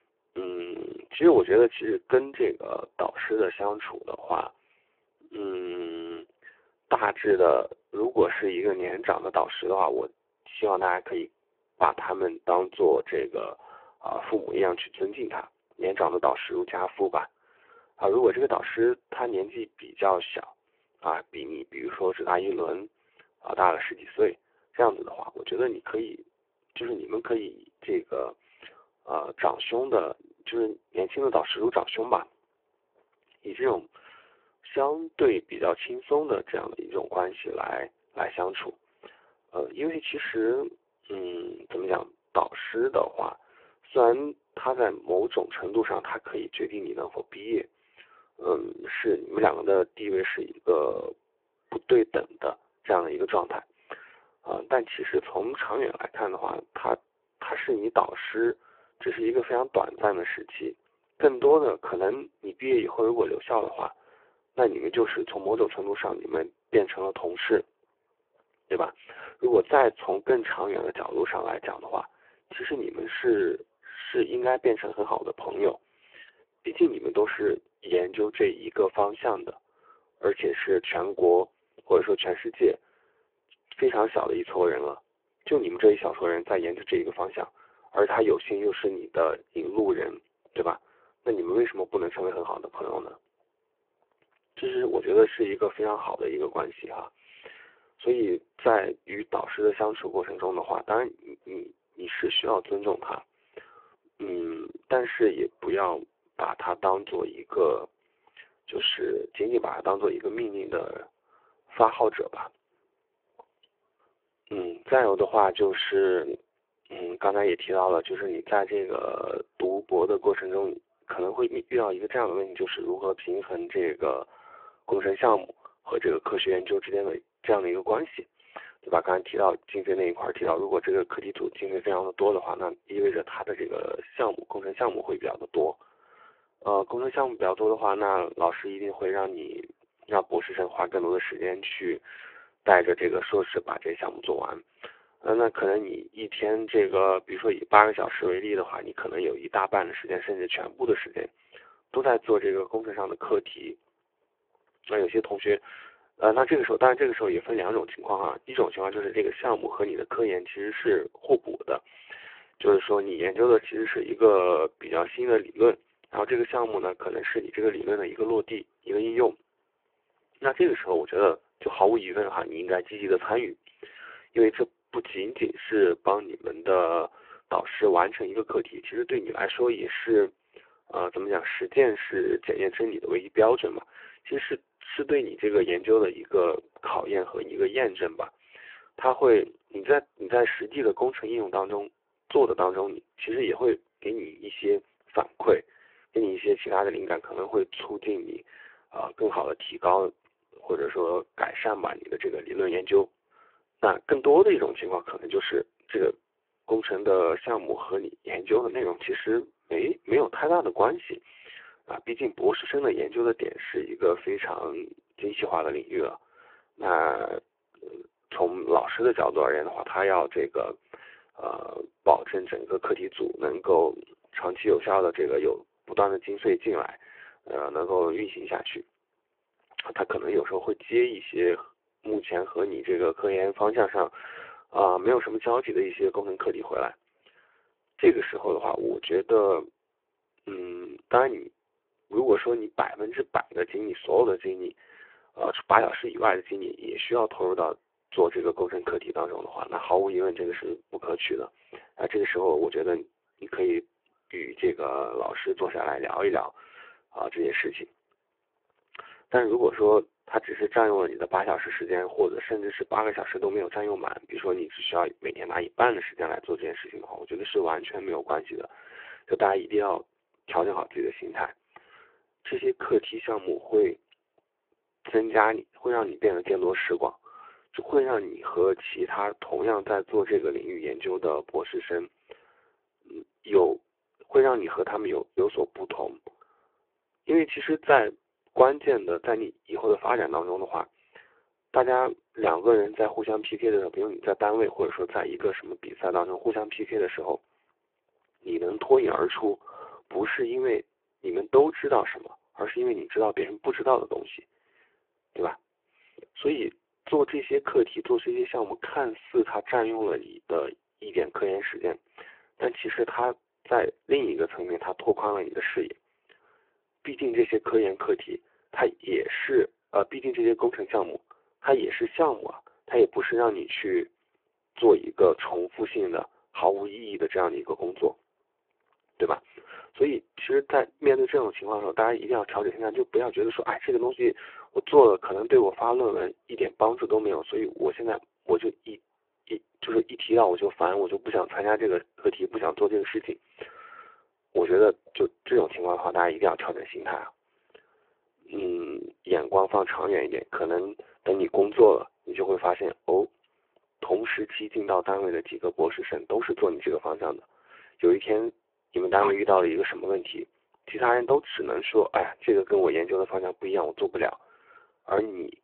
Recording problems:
phone-call audio; poor line

